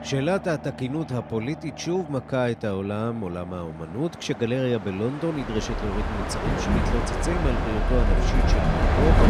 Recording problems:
train or aircraft noise; very loud; throughout; 2 dB above the speech

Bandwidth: 14.5 kHz